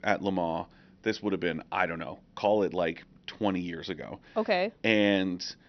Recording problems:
high frequencies cut off; noticeable; nothing above 6 kHz

